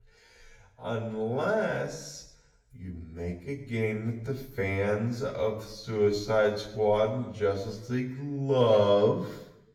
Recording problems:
wrong speed, natural pitch; too slow; 0.6 times normal speed
room echo; slight; dies away in 0.7 s
off-mic speech; somewhat distant

